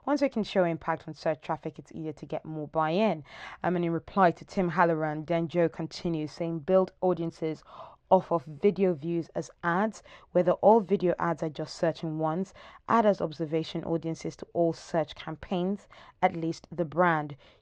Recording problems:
muffled; slightly; fading above 3 kHz

